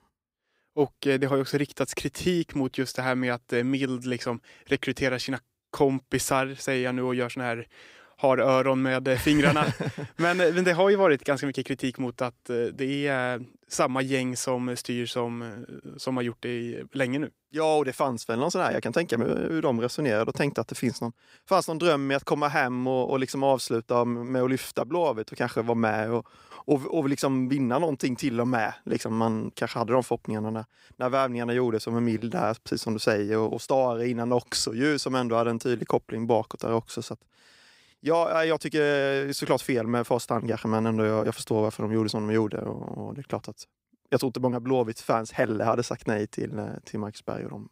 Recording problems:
none

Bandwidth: 15.5 kHz